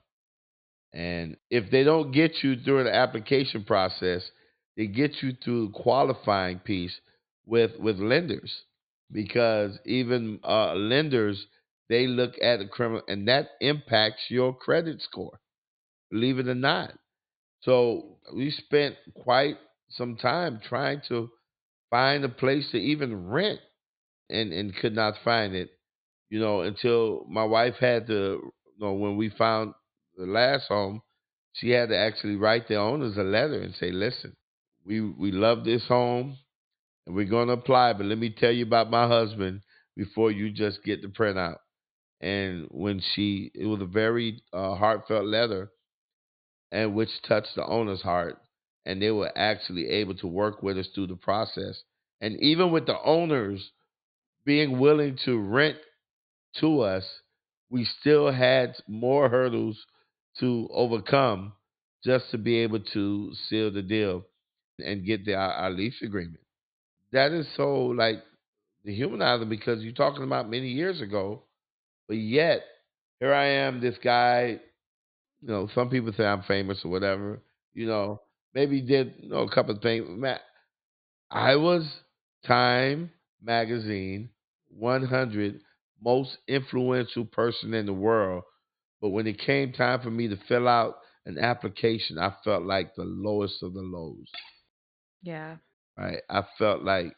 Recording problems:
high frequencies cut off; severe; nothing above 4.5 kHz
clattering dishes; faint; at 1:34; peak 15 dB below the speech

